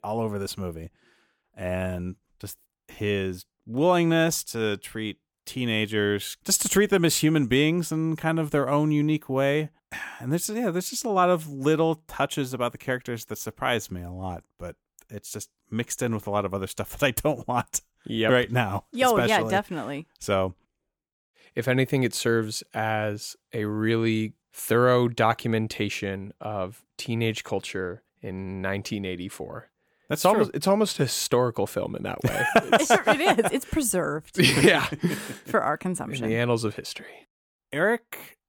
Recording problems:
none

